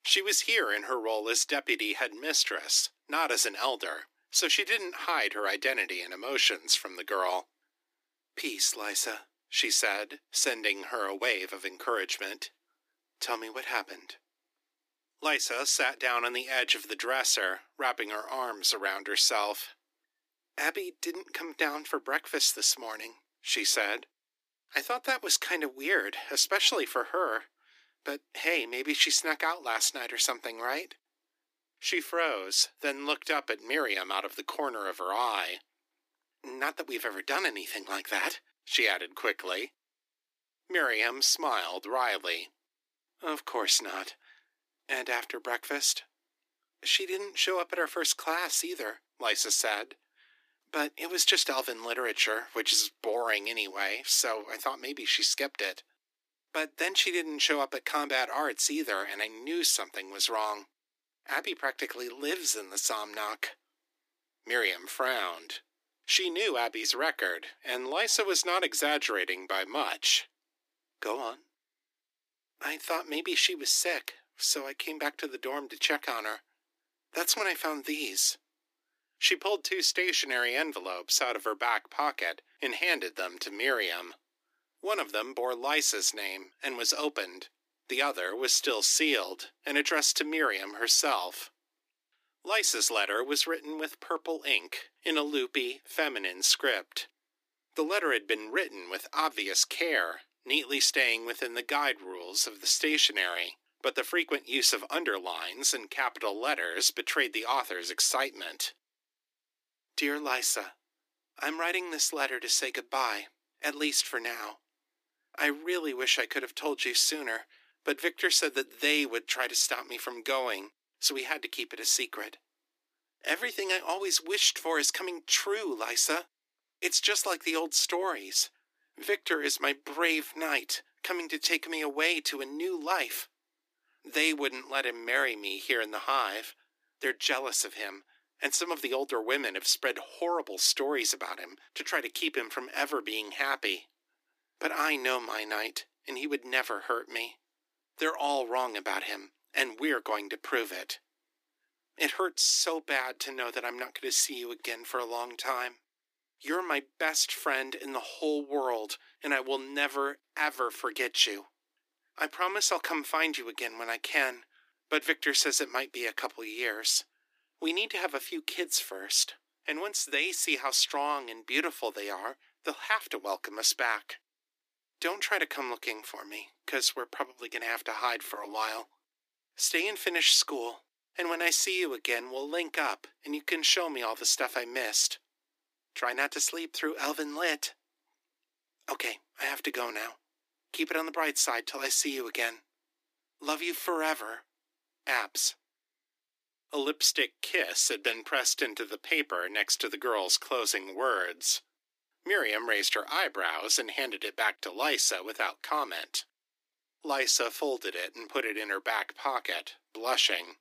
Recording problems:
thin; somewhat; fading below 300 Hz

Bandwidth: 15 kHz